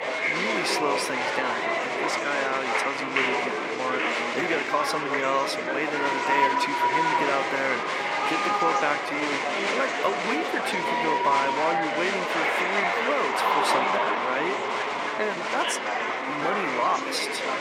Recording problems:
thin; somewhat; fading below 350 Hz
murmuring crowd; very loud; throughout; 4 dB above the speech
uneven, jittery; slightly; from 4.5 to 17 s

